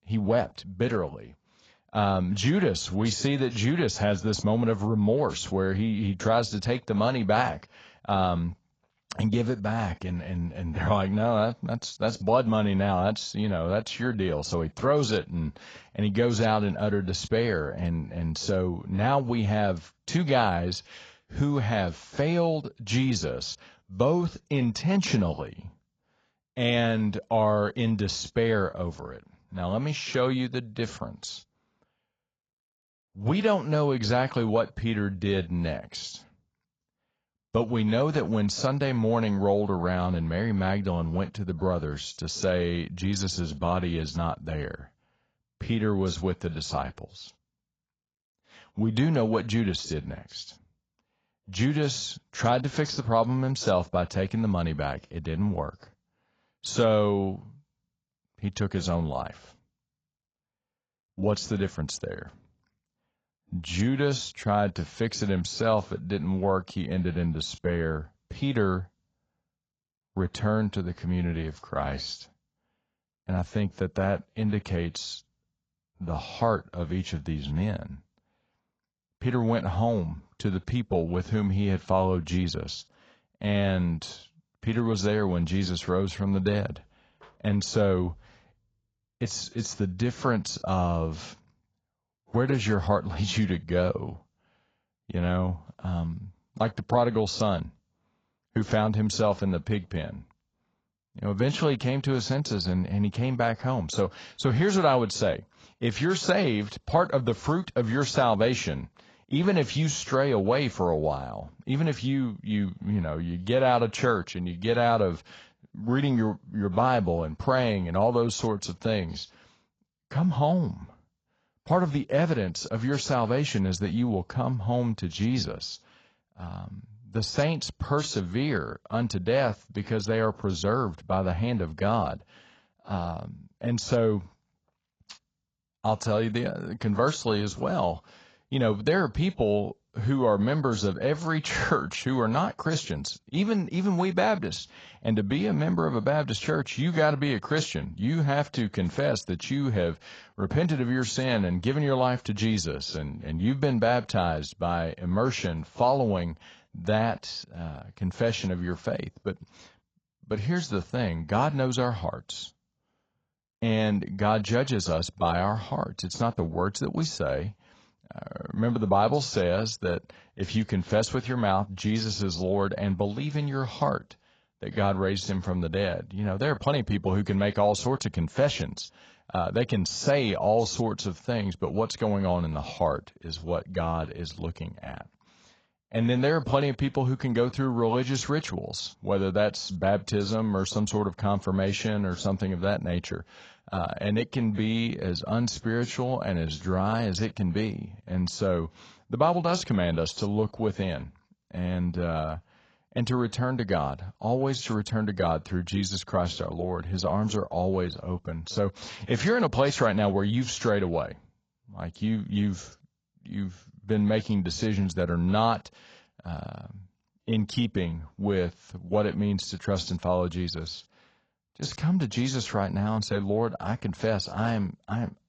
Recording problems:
garbled, watery; badly; nothing above 7.5 kHz

